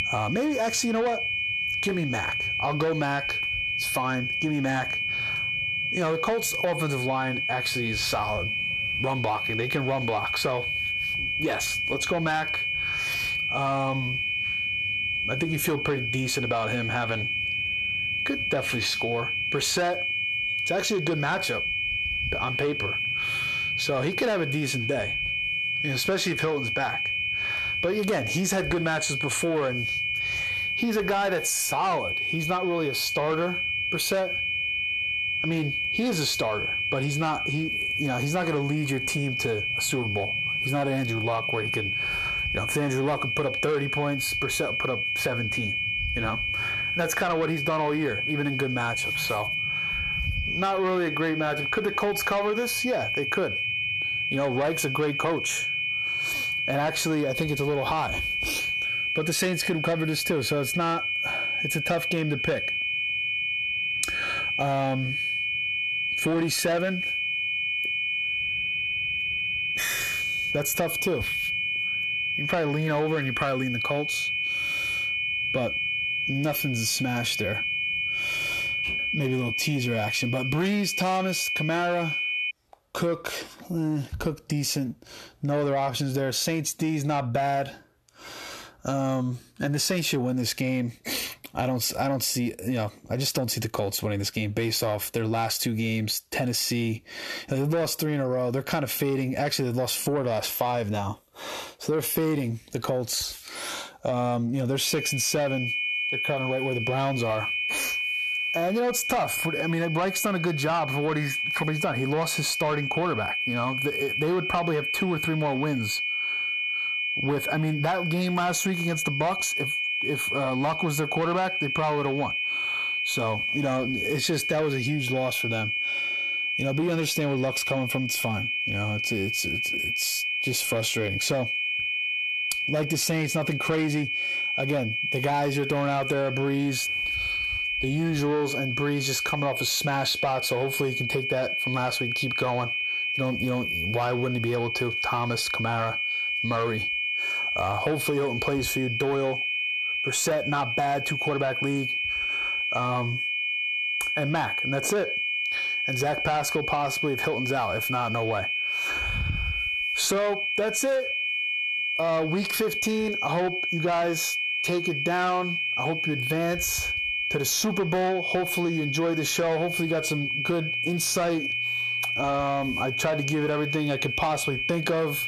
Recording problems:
distortion; slight; 10 dB below the speech
squashed, flat; somewhat
high-pitched whine; loud; until 1:23 and from 1:45 on; 2.5 kHz, as loud as the speech

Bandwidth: 13.5 kHz